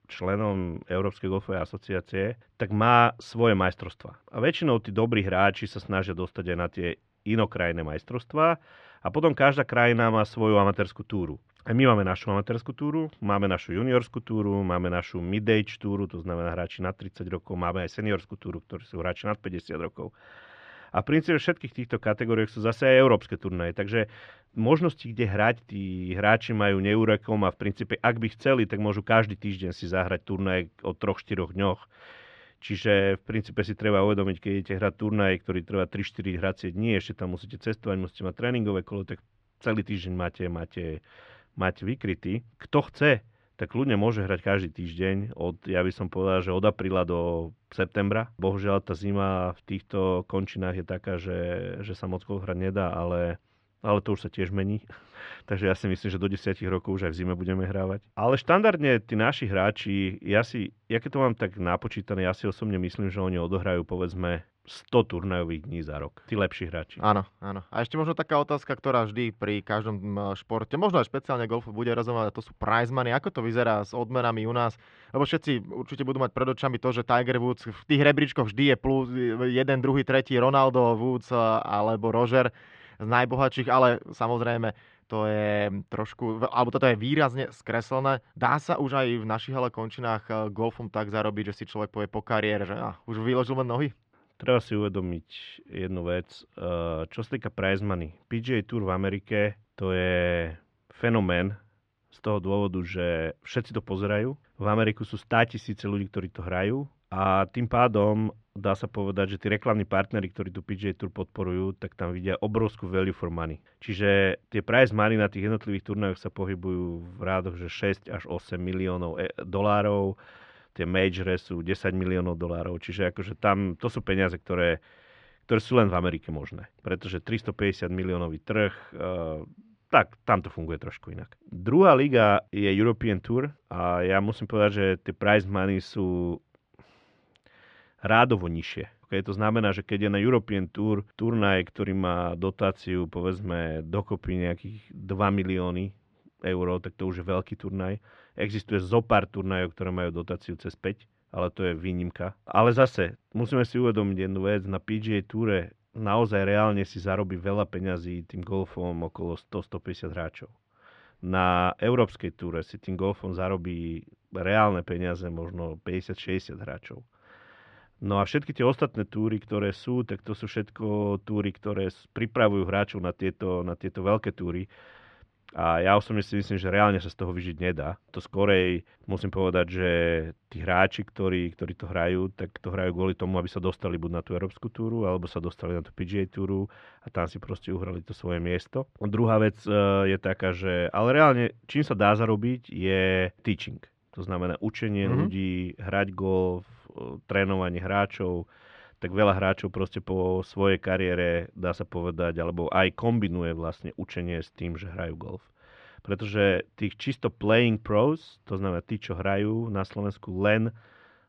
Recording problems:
muffled; slightly; fading above 3 kHz

